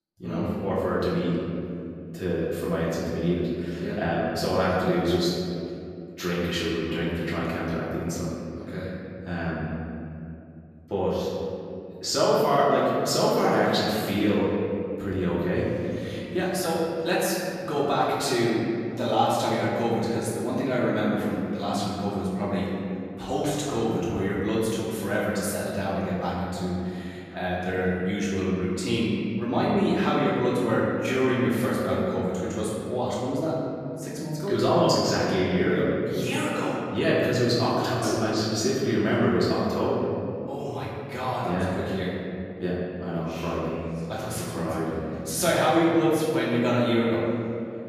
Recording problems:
room echo; strong; dies away in 2.6 s
off-mic speech; far

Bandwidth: 14.5 kHz